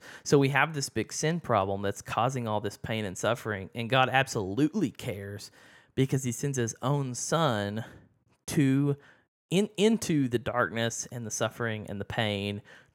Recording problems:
none

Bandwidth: 16.5 kHz